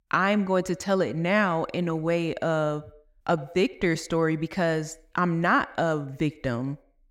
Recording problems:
echo of what is said; faint; throughout; 90 ms later, 20 dB below the speech

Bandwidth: 16 kHz